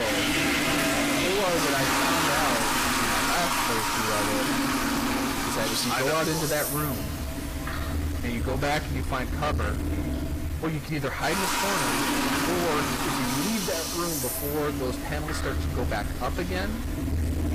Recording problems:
distortion; heavy; 31% of the sound clipped
garbled, watery; slightly; nothing above 15 kHz
household noises; very loud; throughout; 3 dB above the speech
hiss; noticeable; throughout; 10 dB below the speech
abrupt cut into speech; at the start

